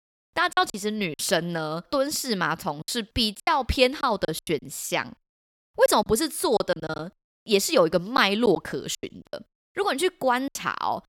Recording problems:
choppy; very; 10% of the speech affected

